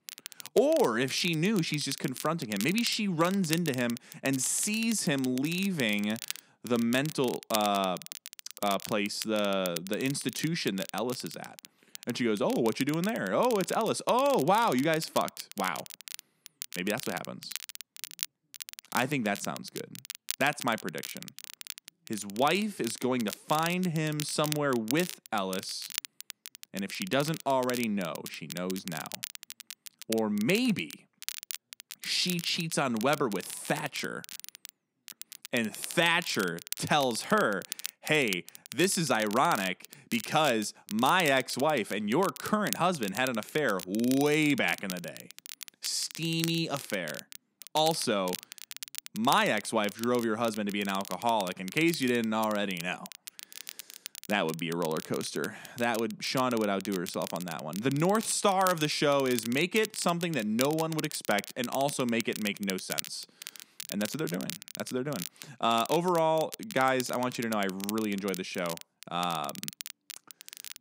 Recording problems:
crackle, like an old record; noticeable; 10 dB below the speech

